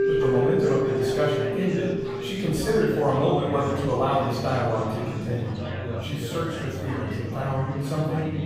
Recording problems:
room echo; strong; dies away in 1.2 s
off-mic speech; far
background music; loud; throughout; 5 dB below the speech
chatter from many people; loud; throughout; 9 dB below the speech

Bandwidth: 15.5 kHz